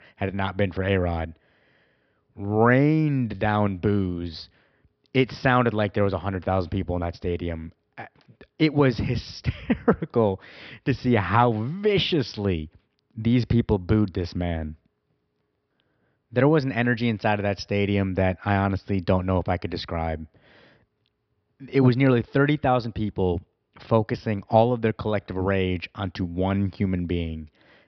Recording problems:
high frequencies cut off; noticeable; nothing above 5.5 kHz

